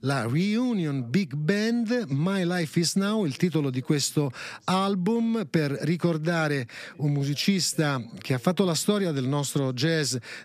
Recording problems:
voice in the background; faint; throughout; 30 dB below the speech

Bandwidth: 14.5 kHz